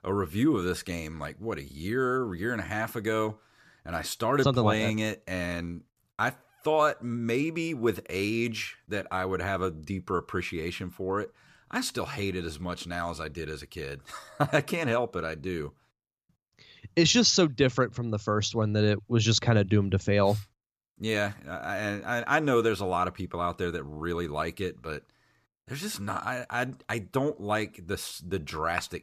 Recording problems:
none

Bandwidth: 14.5 kHz